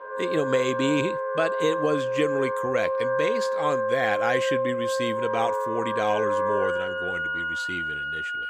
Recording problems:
background music; very loud; throughout; 1 dB above the speech

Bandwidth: 15.5 kHz